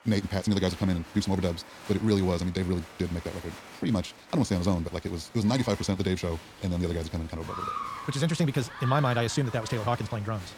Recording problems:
wrong speed, natural pitch; too fast; 1.7 times normal speed
crowd noise; noticeable; throughout; 15 dB below the speech

